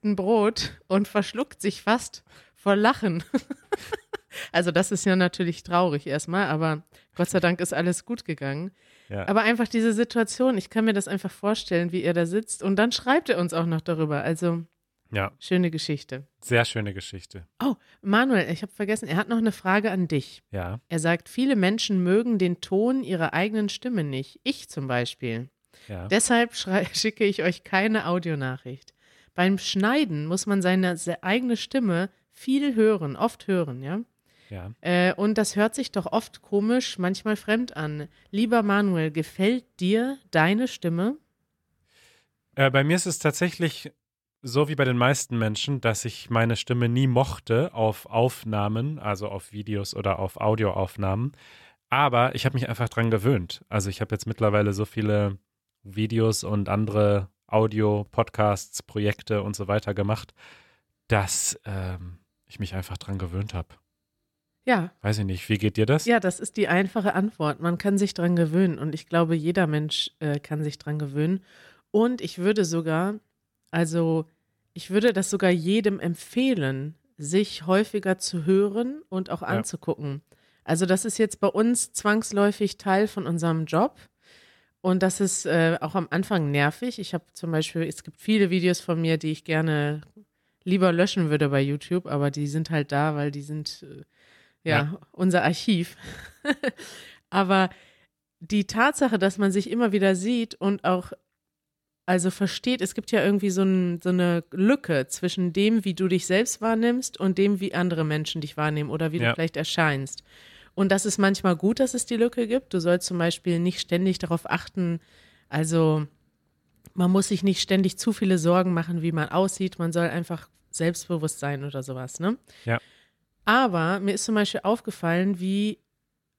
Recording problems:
none

